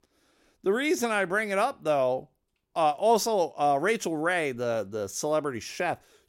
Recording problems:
none

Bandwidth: 16 kHz